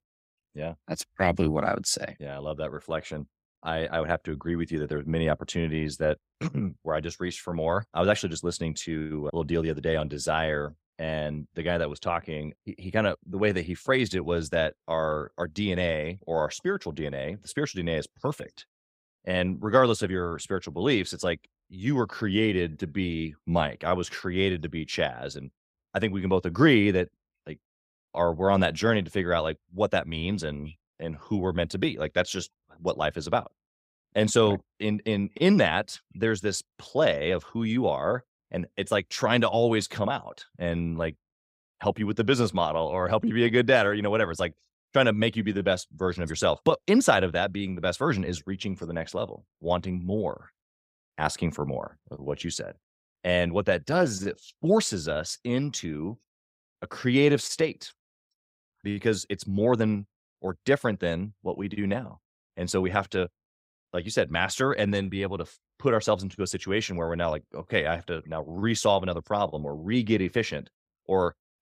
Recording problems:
none

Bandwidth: 15.5 kHz